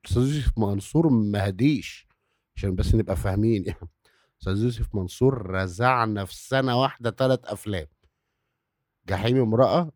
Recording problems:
muffled; slightly; fading above 3.5 kHz

